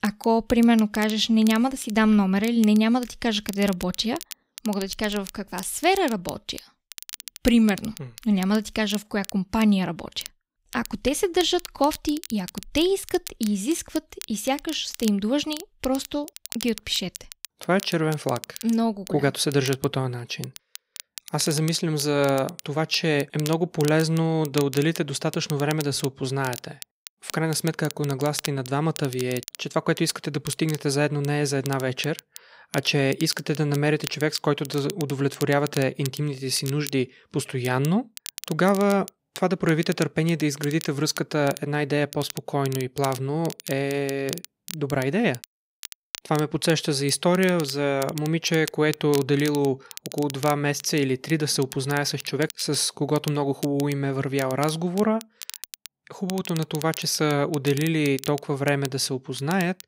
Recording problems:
crackle, like an old record; noticeable; 15 dB below the speech

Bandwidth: 15.5 kHz